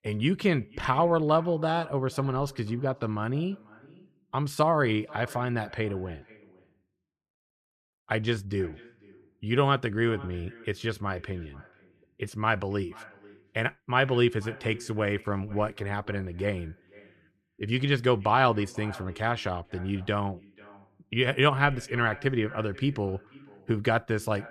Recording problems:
echo of what is said; faint; throughout; 490 ms later, 20 dB below the speech

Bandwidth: 14 kHz